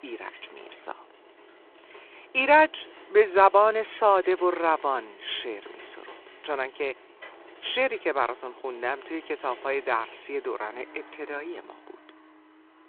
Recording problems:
phone-call audio
traffic noise; faint; throughout; 25 dB below the speech

